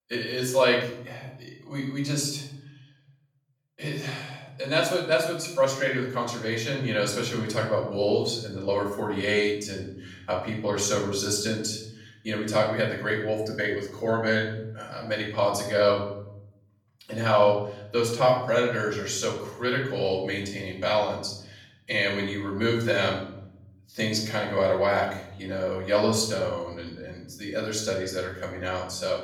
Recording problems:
off-mic speech; far
room echo; noticeable; dies away in 0.8 s

